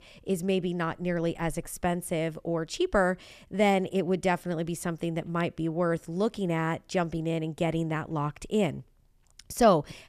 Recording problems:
none

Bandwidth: 14.5 kHz